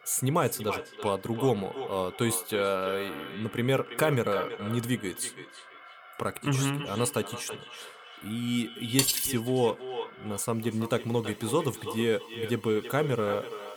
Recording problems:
echo of what is said; strong; throughout; 330 ms later, 10 dB below the speech
alarms or sirens; faint; throughout; 20 dB below the speech
clattering dishes; loud; at 9 s; peak 4 dB above the speech

